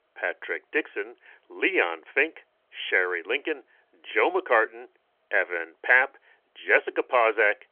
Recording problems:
phone-call audio

